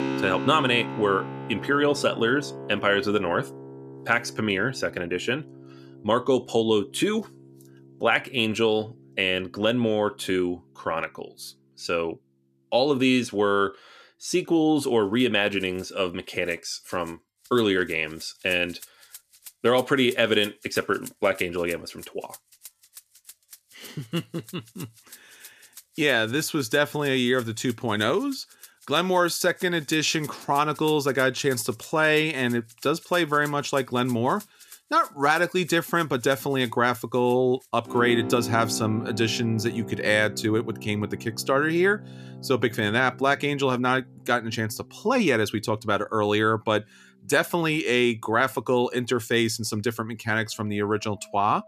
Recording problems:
background music; noticeable; throughout; 15 dB below the speech

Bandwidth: 14.5 kHz